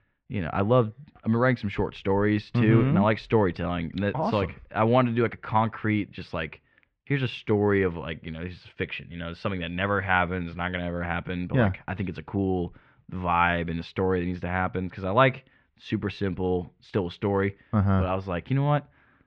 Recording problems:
muffled; very; fading above 3 kHz

